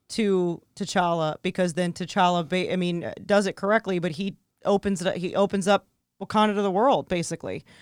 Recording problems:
none

